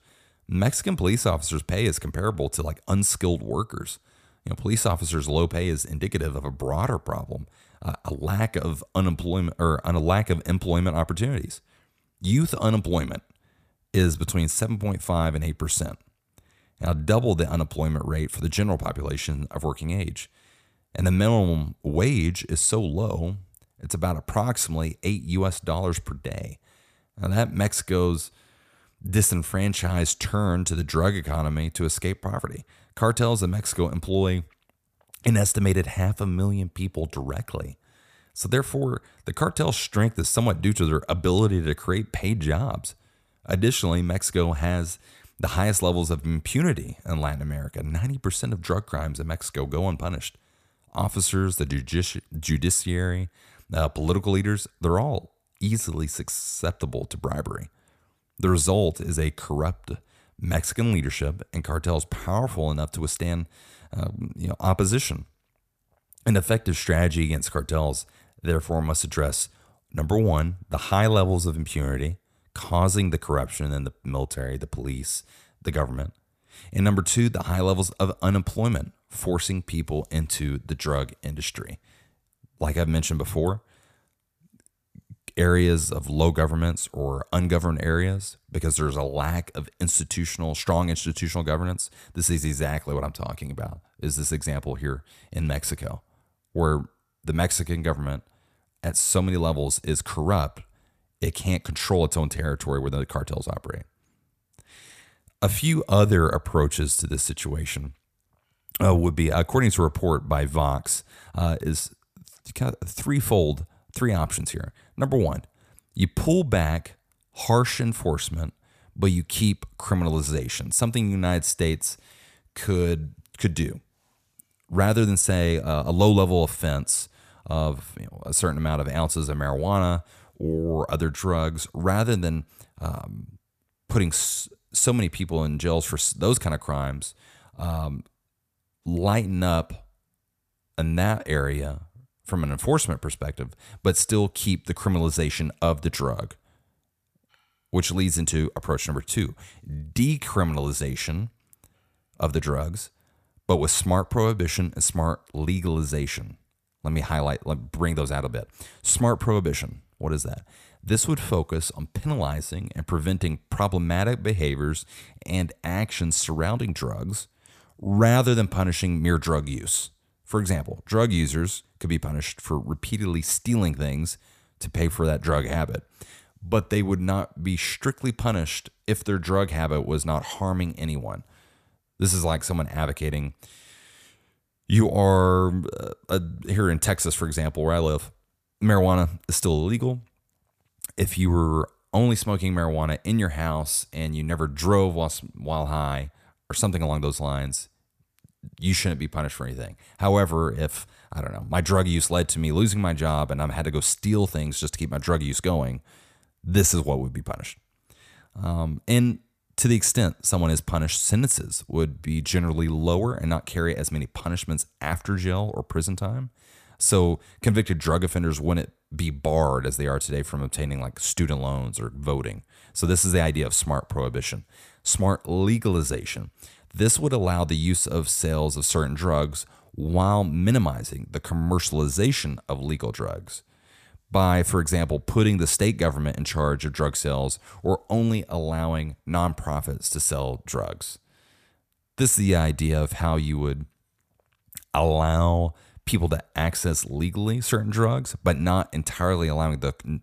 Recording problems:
none

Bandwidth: 14.5 kHz